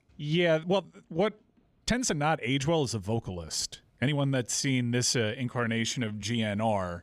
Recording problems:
uneven, jittery; strongly; from 0.5 to 6 s

